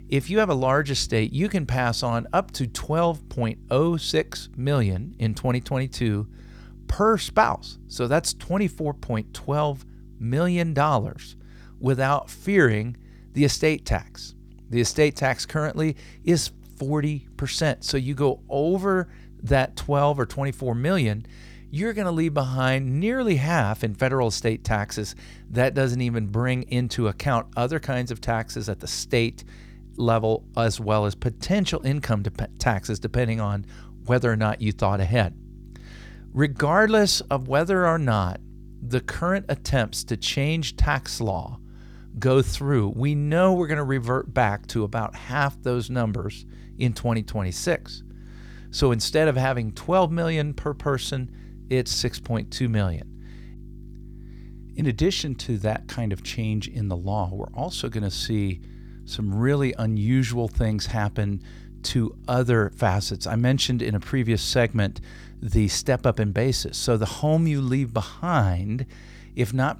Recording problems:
electrical hum; faint; throughout; 50 Hz, 30 dB below the speech

